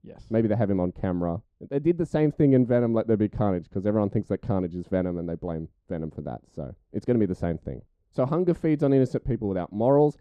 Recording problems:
muffled; very; fading above 1.5 kHz

